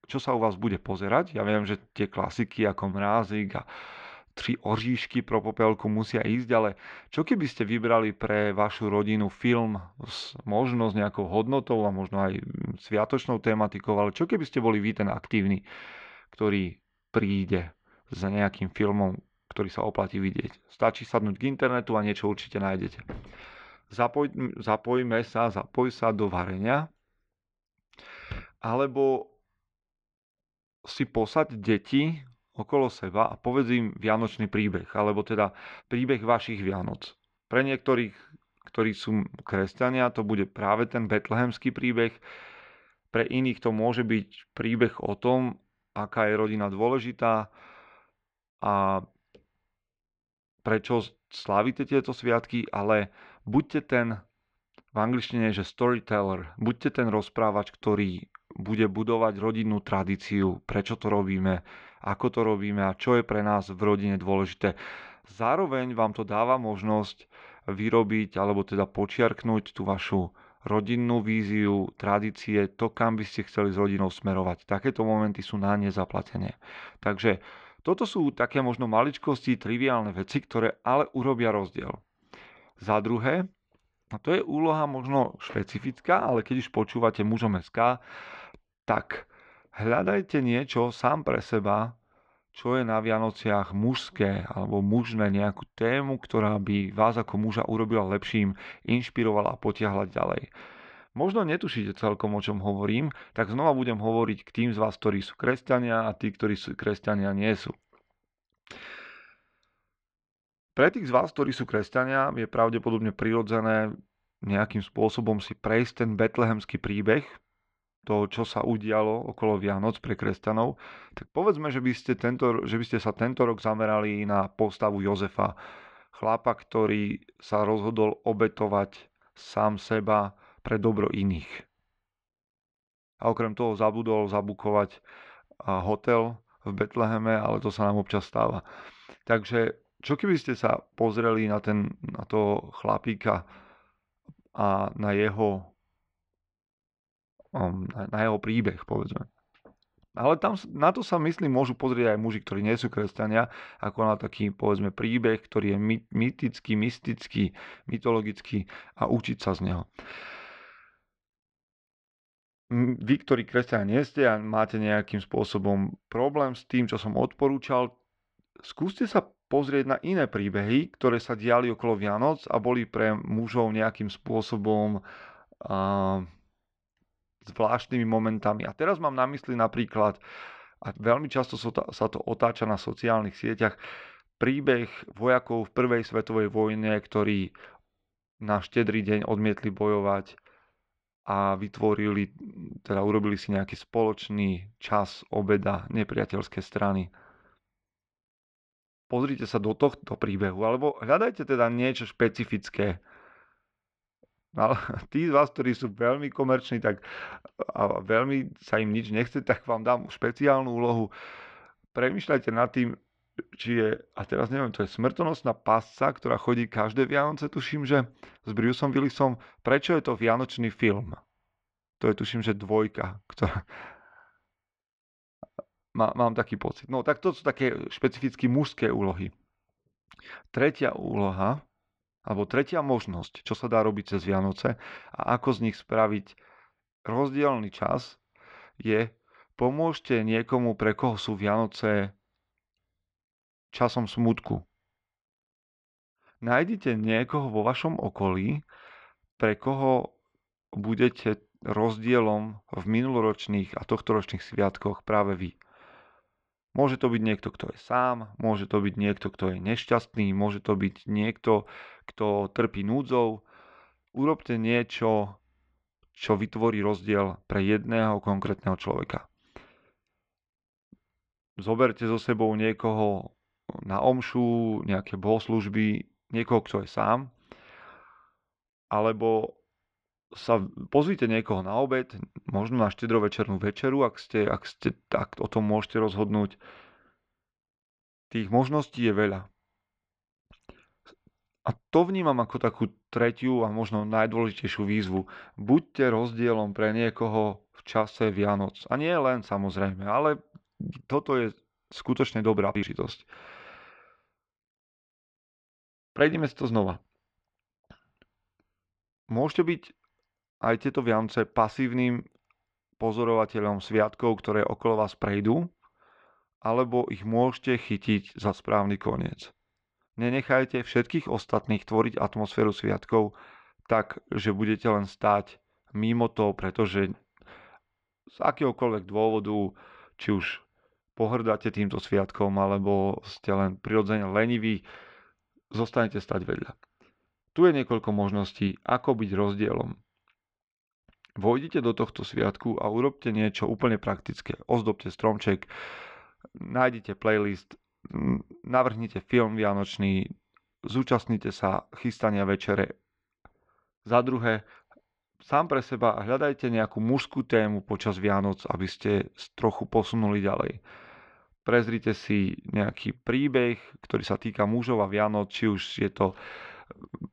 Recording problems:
muffled; very; fading above 3 kHz

